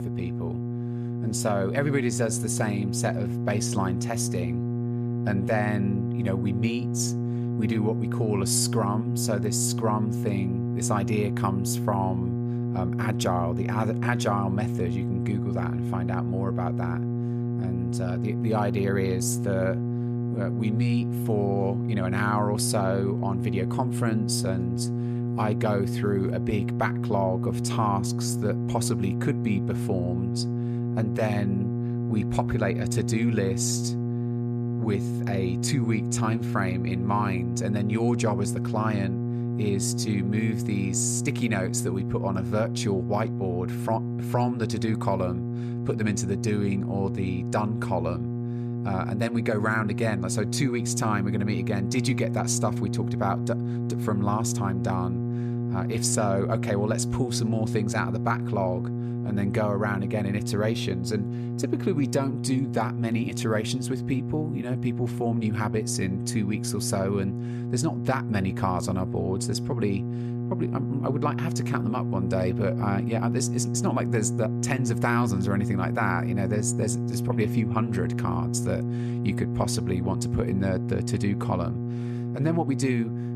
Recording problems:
electrical hum; loud; throughout; 60 Hz, 6 dB below the speech

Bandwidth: 14.5 kHz